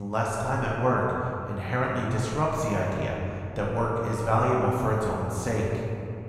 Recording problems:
off-mic speech; far
room echo; noticeable; dies away in 2.2 s
abrupt cut into speech; at the start

